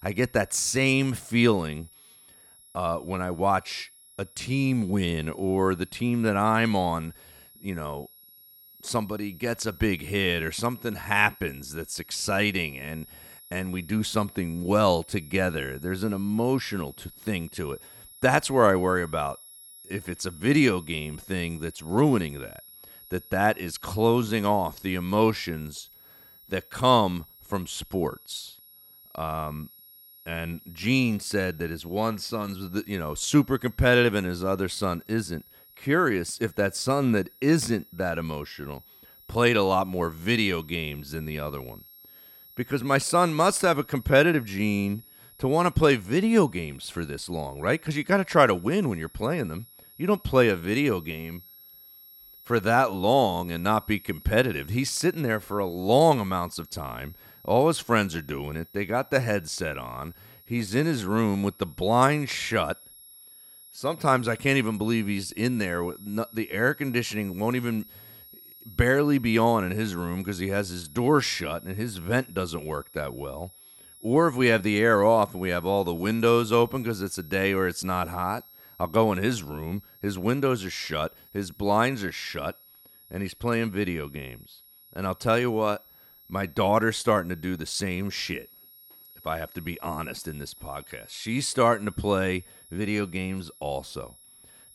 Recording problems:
high-pitched whine; faint; throughout; 11.5 kHz, 20 dB below the speech

